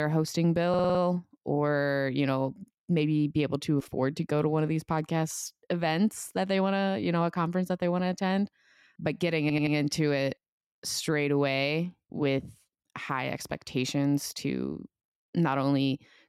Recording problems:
abrupt cut into speech; at the start
audio stuttering; at 0.5 s and at 9.5 s

